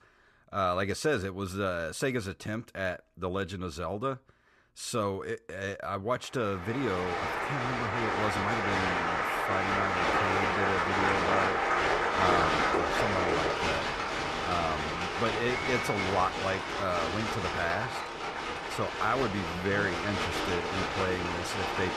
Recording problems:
crowd noise; very loud; from 7 s on; 3 dB above the speech

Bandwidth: 13.5 kHz